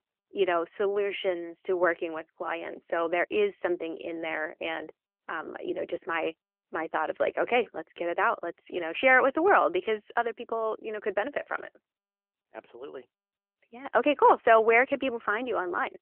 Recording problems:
phone-call audio; nothing above 3 kHz

